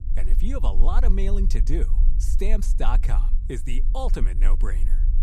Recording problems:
low rumble; noticeable; throughout; 15 dB below the speech

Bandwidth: 15 kHz